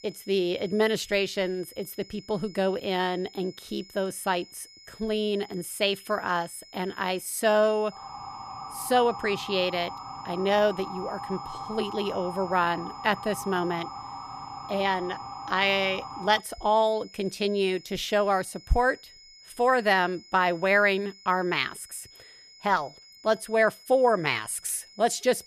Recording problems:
high-pitched whine; faint; throughout; 5 kHz, 20 dB below the speech
siren; faint; from 8 to 16 s; peak 10 dB below the speech

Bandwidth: 14.5 kHz